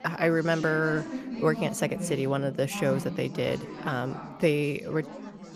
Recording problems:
chatter from many people; loud; throughout; 10 dB below the speech

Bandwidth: 15 kHz